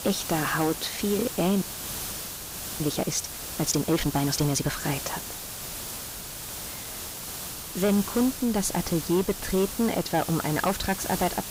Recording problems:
distortion; slight; 10 dB below the speech
hiss; loud; throughout; 7 dB below the speech
audio freezing; at 1.5 s for 1 s

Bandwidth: 15.5 kHz